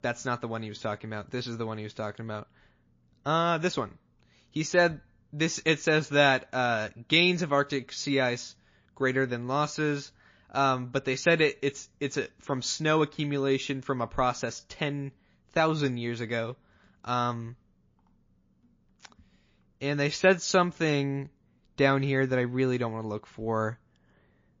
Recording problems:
garbled, watery; slightly

